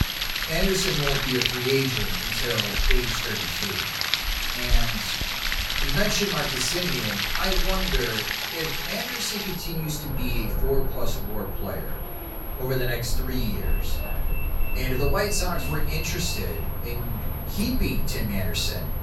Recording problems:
off-mic speech; far
room echo; slight; dies away in 0.5 s
rain or running water; very loud; throughout; 2 dB above the speech
high-pitched whine; loud; throughout; 11.5 kHz, 10 dB below the speech
traffic noise; loud; throughout; 9 dB below the speech

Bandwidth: 18 kHz